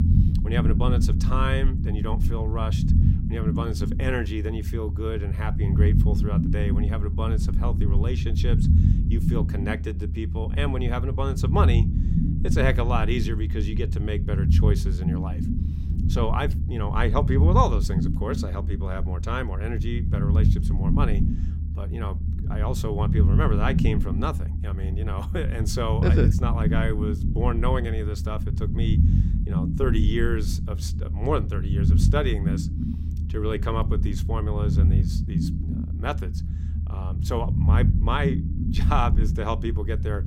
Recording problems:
low rumble; loud; throughout; 6 dB below the speech

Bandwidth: 16 kHz